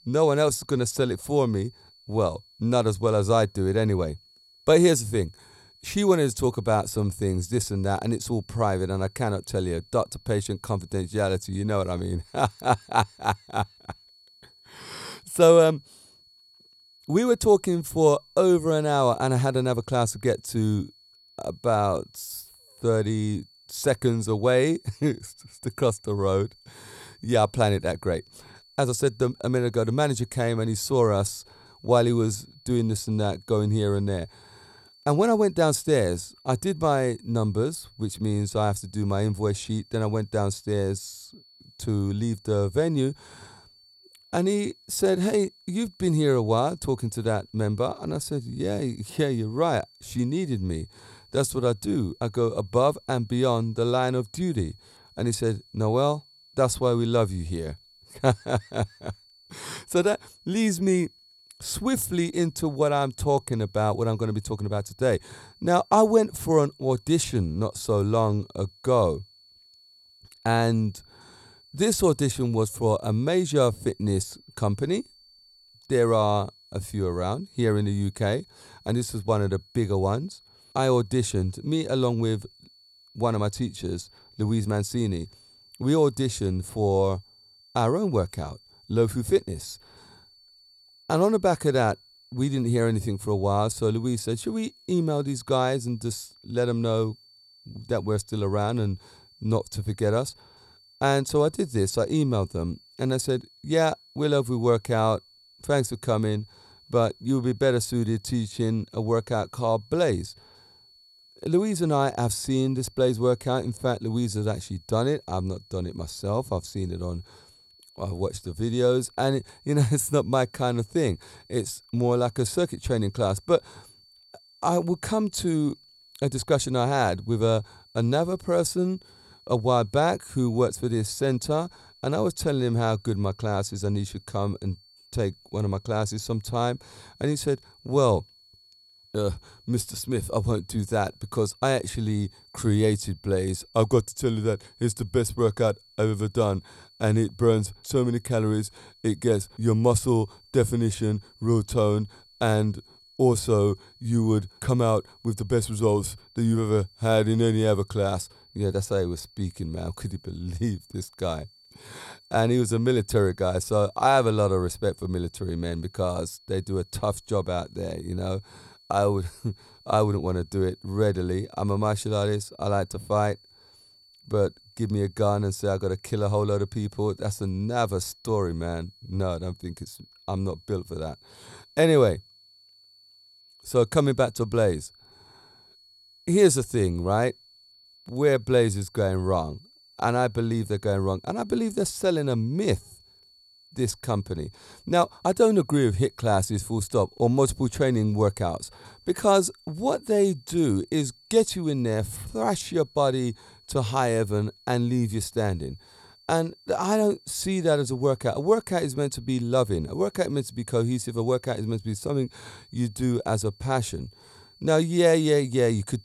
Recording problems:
high-pitched whine; faint; throughout; 4.5 kHz, 30 dB below the speech

